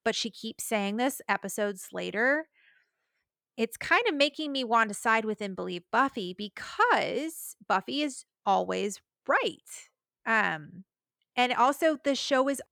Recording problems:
none

